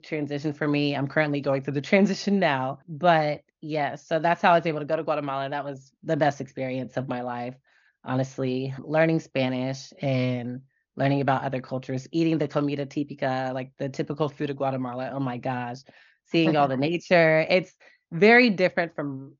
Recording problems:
high frequencies cut off; noticeable; nothing above 6.5 kHz

